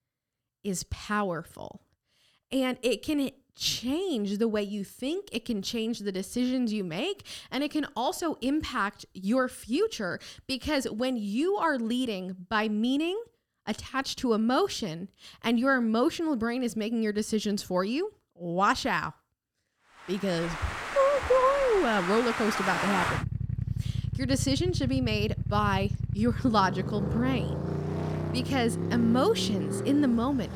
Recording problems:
traffic noise; loud; from 20 s on; 4 dB below the speech

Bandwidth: 17.5 kHz